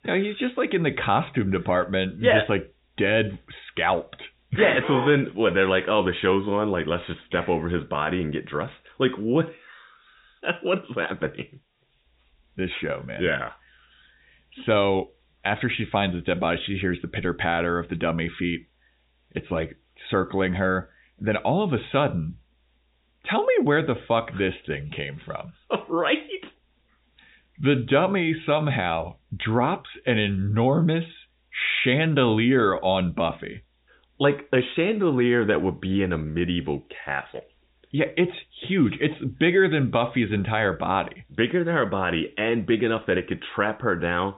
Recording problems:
high frequencies cut off; severe; nothing above 4 kHz
hiss; very faint; throughout; 45 dB below the speech

